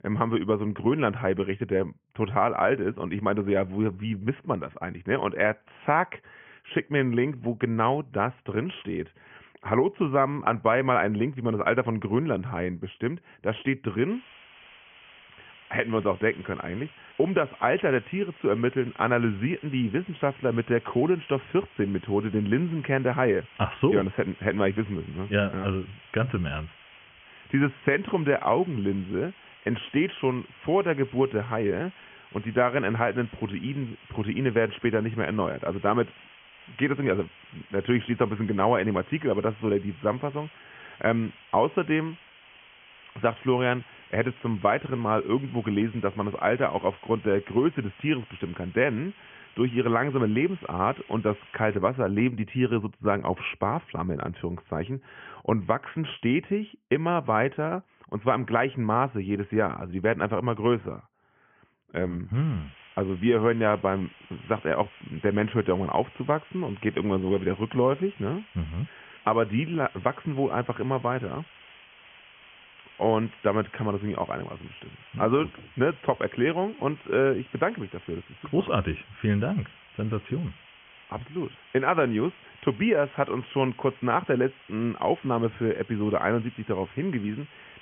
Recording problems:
high frequencies cut off; severe; nothing above 3 kHz
hiss; faint; from 14 to 52 s and from 1:02 on; 20 dB below the speech

